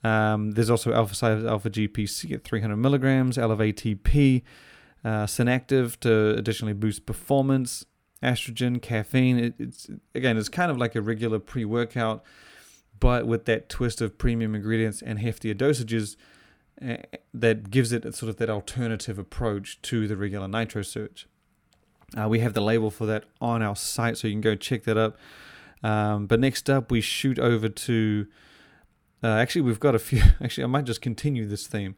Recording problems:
none

